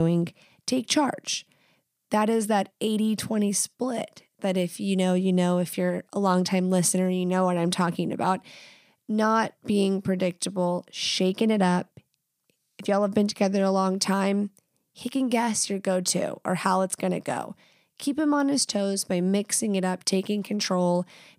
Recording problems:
abrupt cut into speech; at the start

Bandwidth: 15 kHz